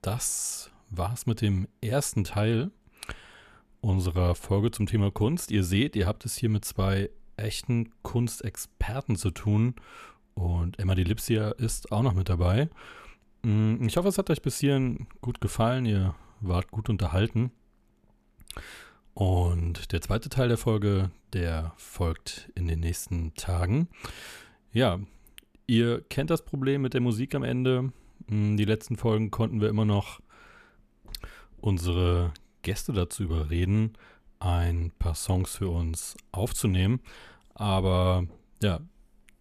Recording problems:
none

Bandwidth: 14.5 kHz